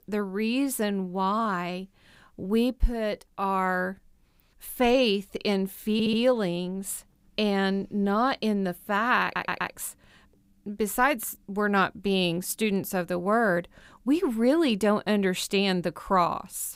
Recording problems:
audio stuttering; at 6 s and at 9 s

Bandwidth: 15.5 kHz